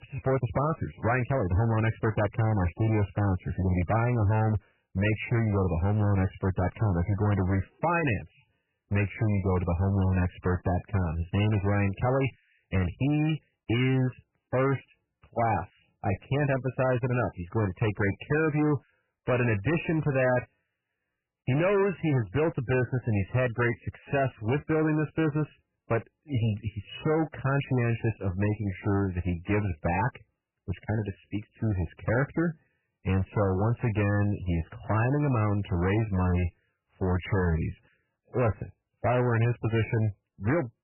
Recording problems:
garbled, watery; badly; nothing above 3 kHz
distortion; slight; 14% of the sound clipped

